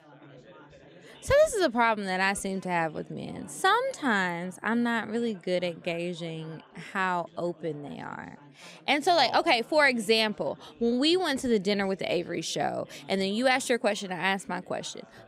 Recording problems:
background chatter; faint; throughout; 4 voices, 25 dB below the speech

